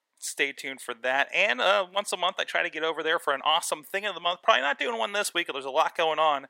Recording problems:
thin; very; fading below 700 Hz

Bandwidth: 16 kHz